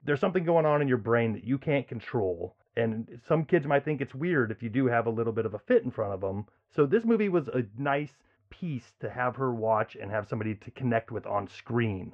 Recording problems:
muffled; very; fading above 1.5 kHz

